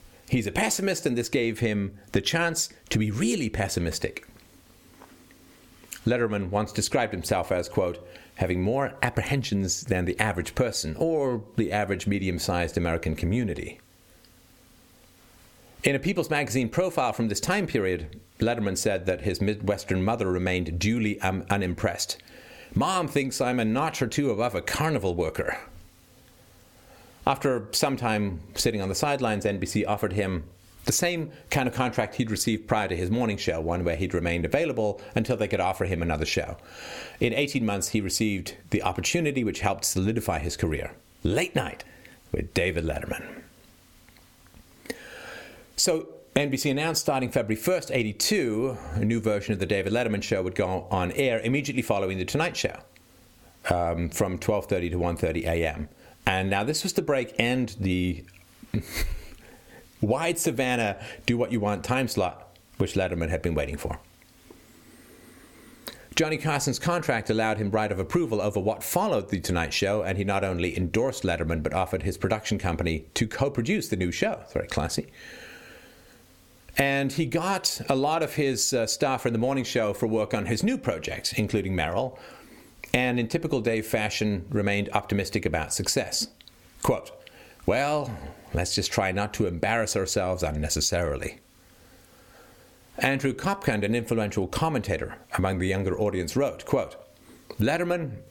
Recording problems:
squashed, flat; somewhat

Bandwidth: 17.5 kHz